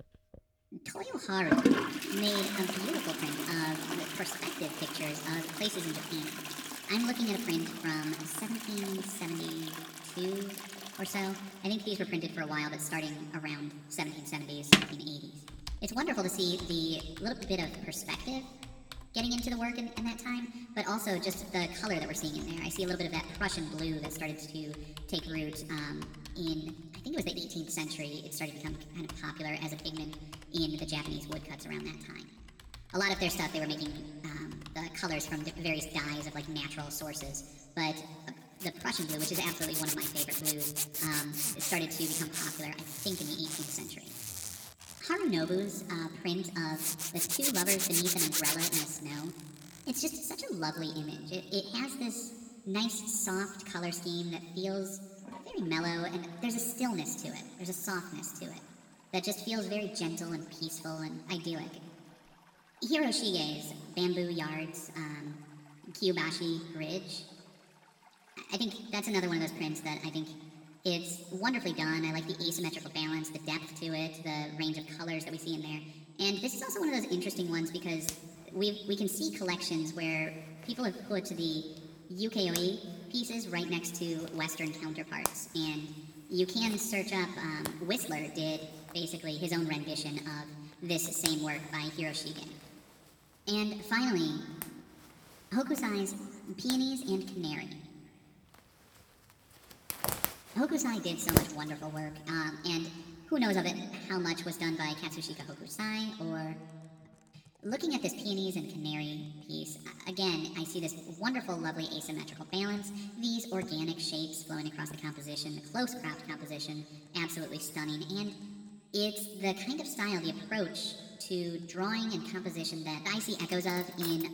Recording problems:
wrong speed and pitch; too fast and too high; 1.5 times normal speed
room echo; slight; dies away in 1.8 s
off-mic speech; somewhat distant
household noises; loud; throughout; as loud as the speech

